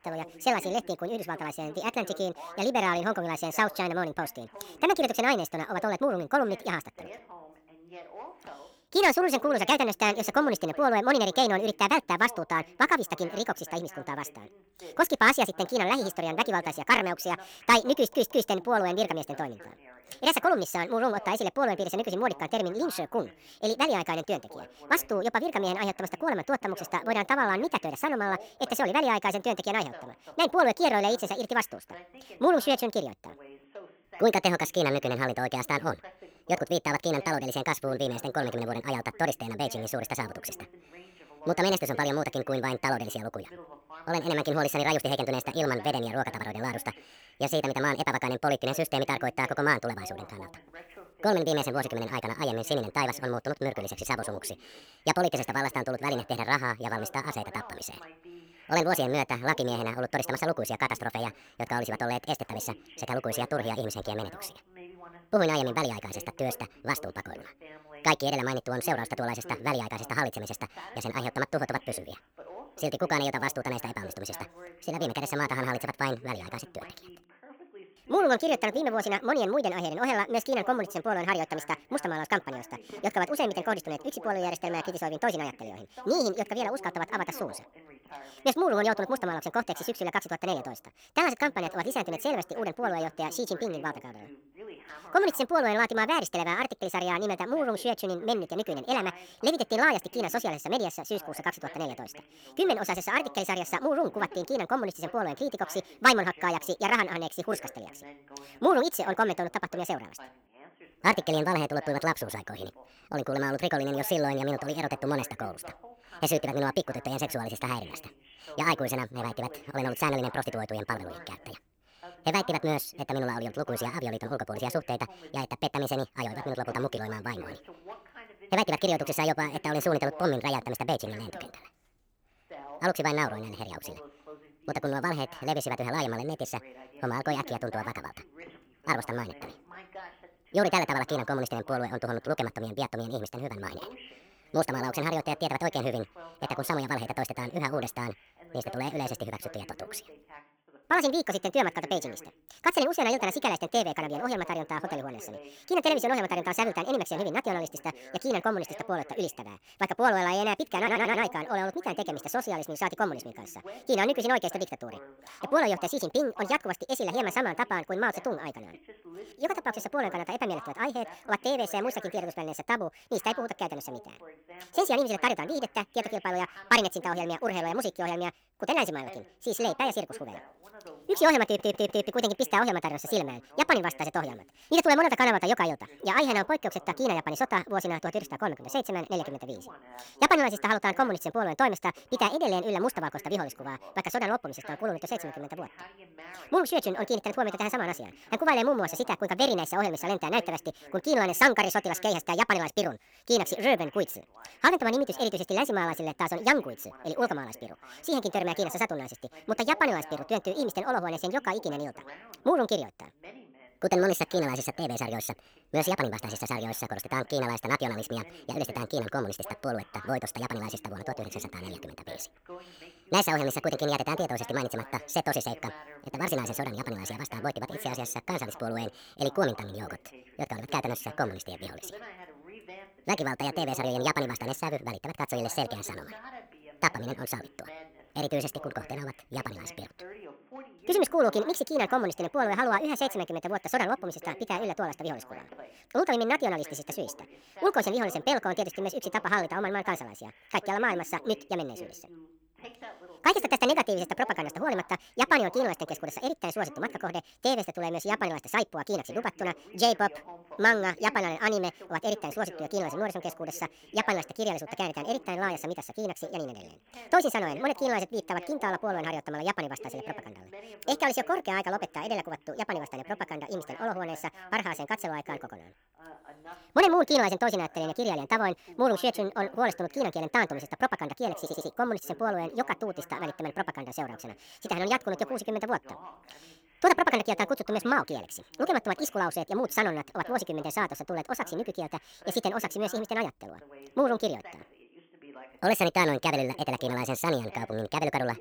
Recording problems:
wrong speed and pitch; too fast and too high; 1.7 times normal speed
voice in the background; faint; throughout; 20 dB below the speech
audio stuttering; 4 times, first at 18 s

